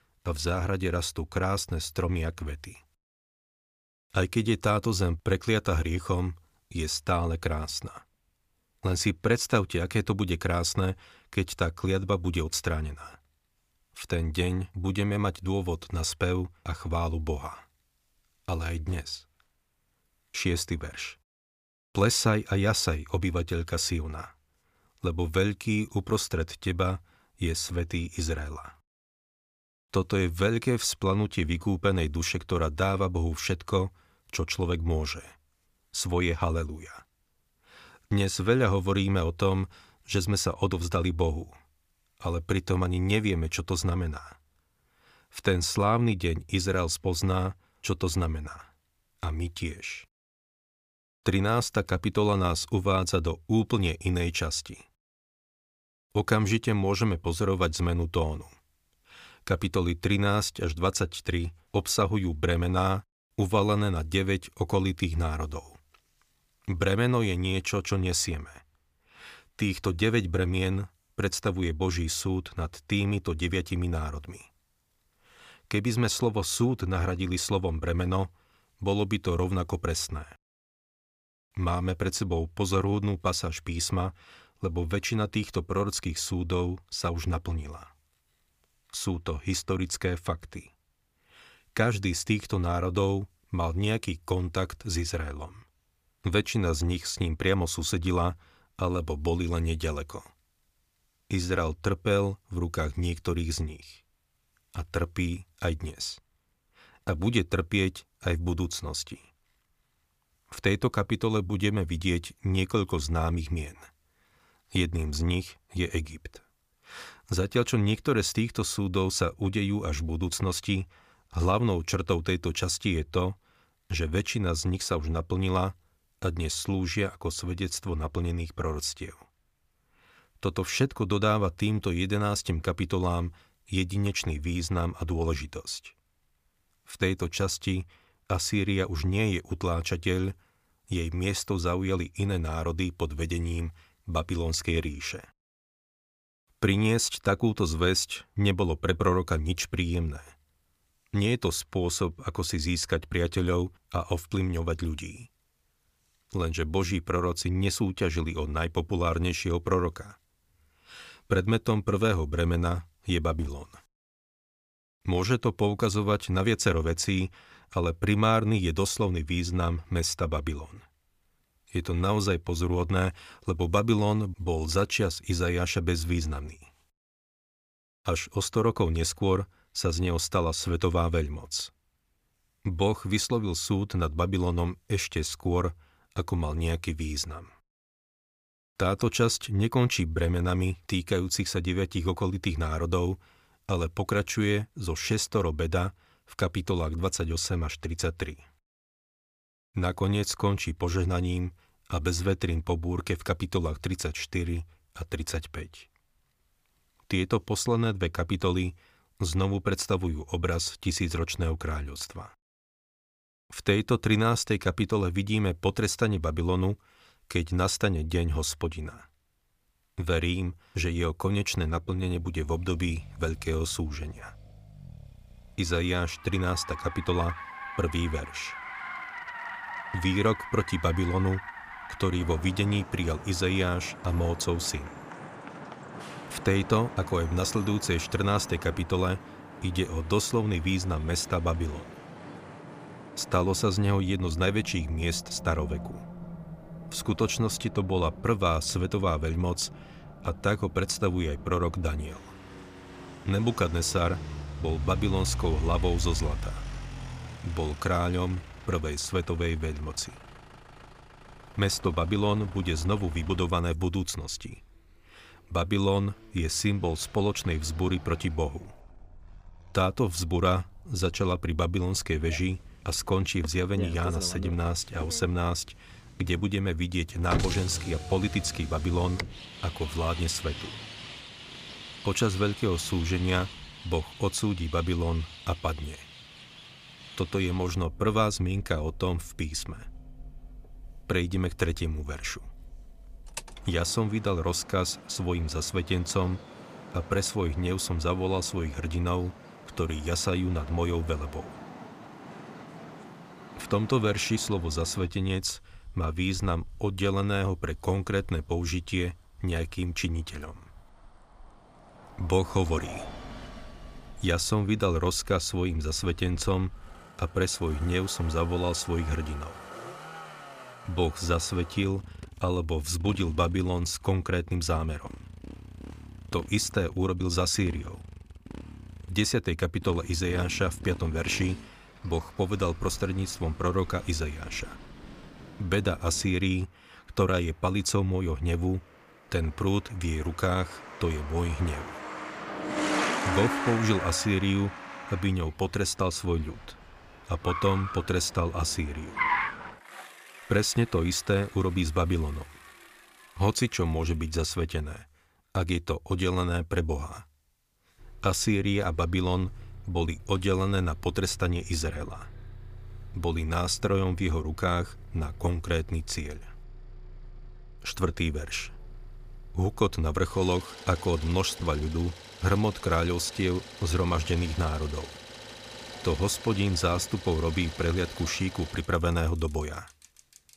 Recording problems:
traffic noise; noticeable; from 3:42 on; 10 dB below the speech

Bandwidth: 15 kHz